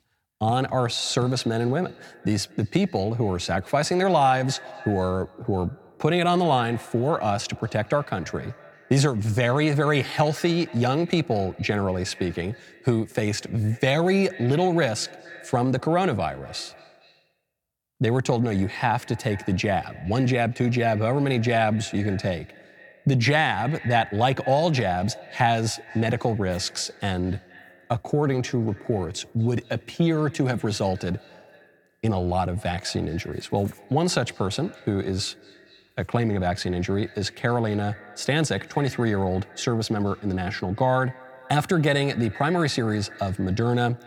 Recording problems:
echo of what is said; faint; throughout; 230 ms later, 20 dB below the speech

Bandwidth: 18.5 kHz